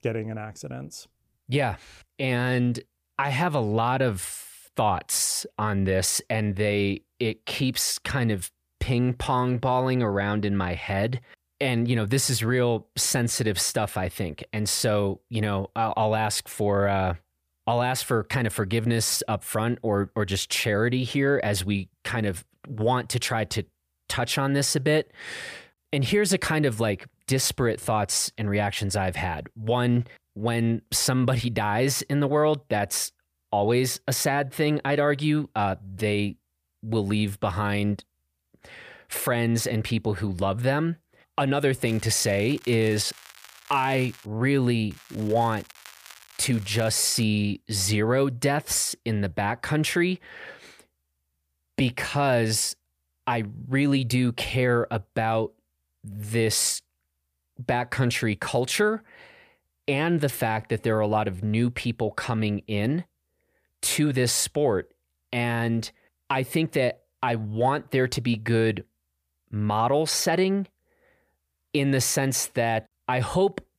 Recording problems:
crackling; faint; from 42 to 44 s and from 45 to 47 s; 20 dB below the speech

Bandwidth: 15 kHz